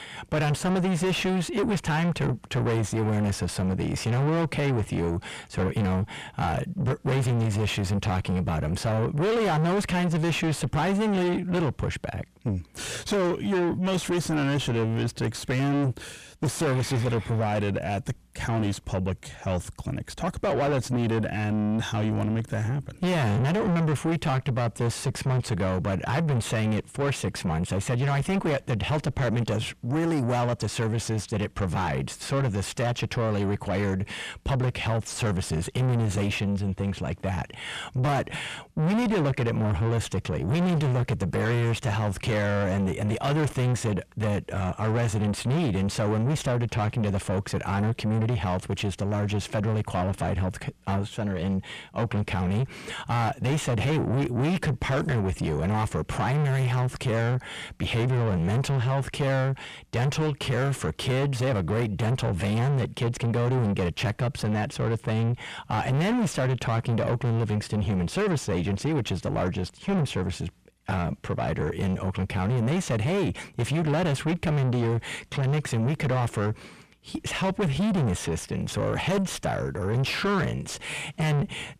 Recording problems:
distortion; heavy; 5 dB below the speech

